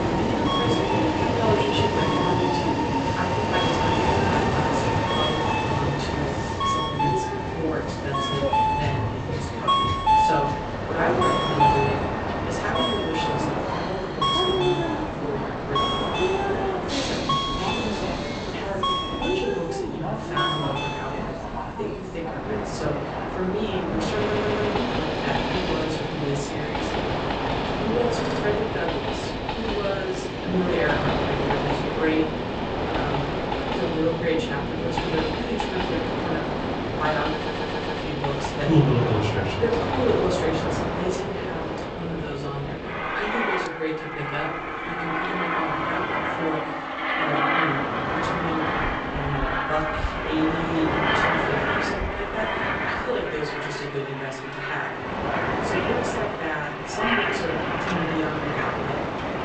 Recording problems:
off-mic speech; far
room echo; slight; dies away in 0.6 s
garbled, watery; slightly; nothing above 8 kHz
train or aircraft noise; very loud; throughout; 4 dB above the speech
audio stuttering; at 24 s, at 28 s and at 37 s

